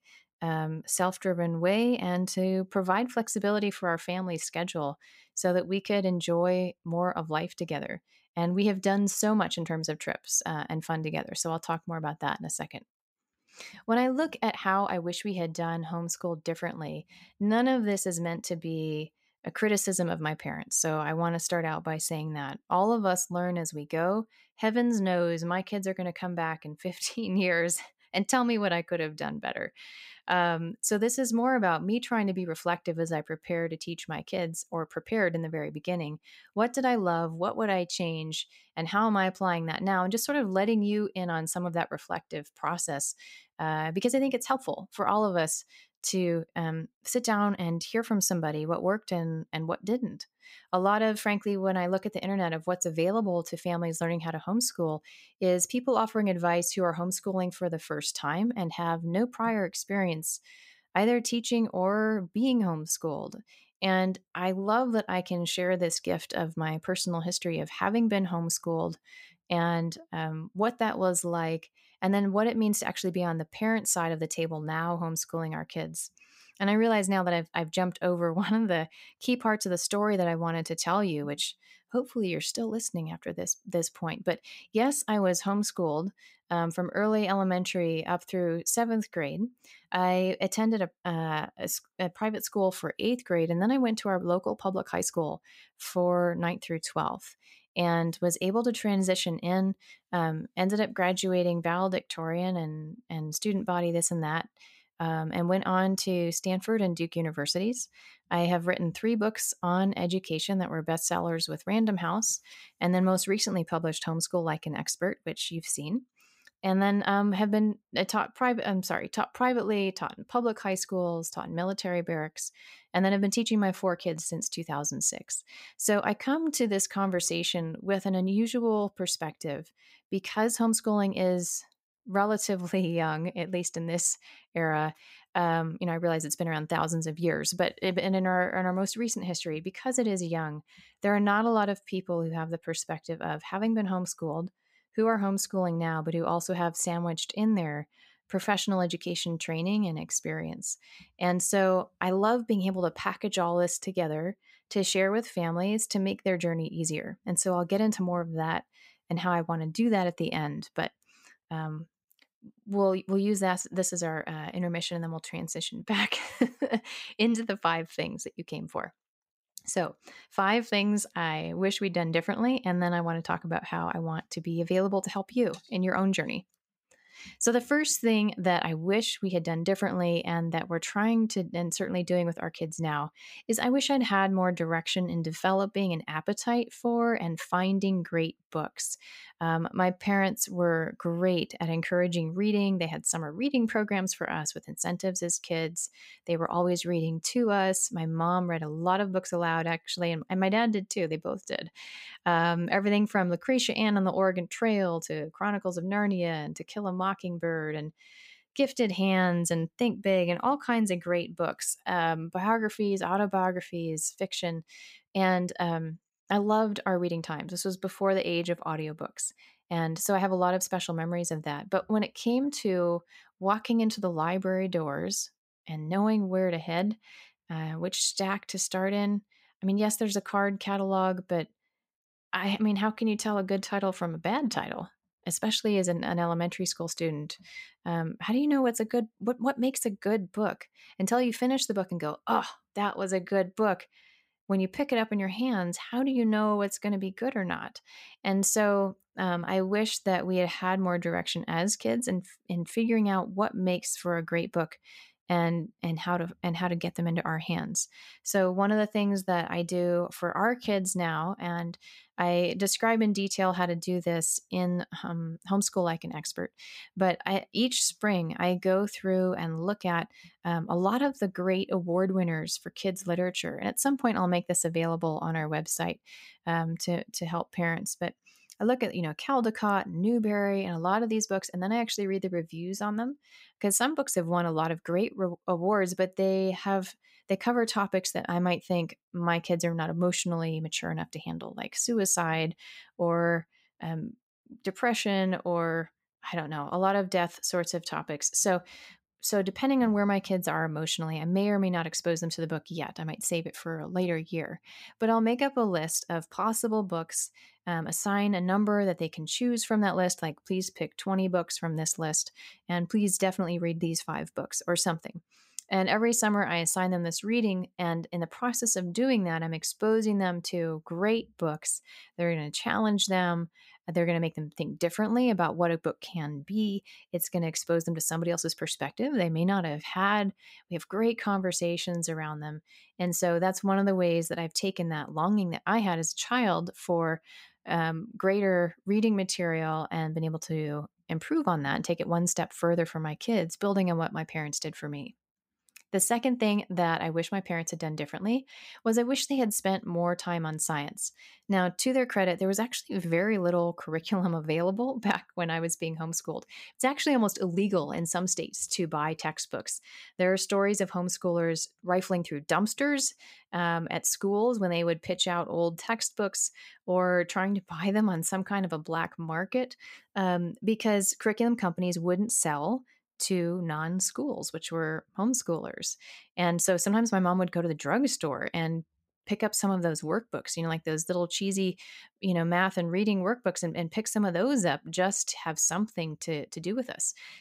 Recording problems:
none

